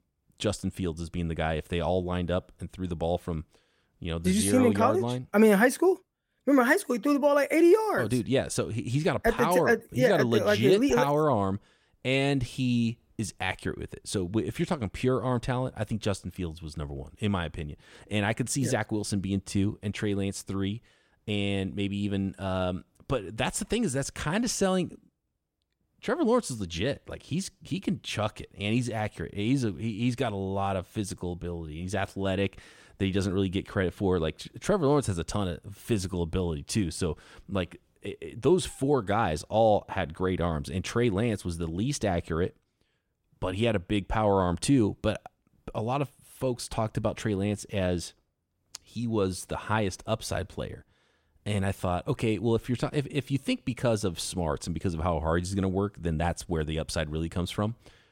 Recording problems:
none

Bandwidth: 17.5 kHz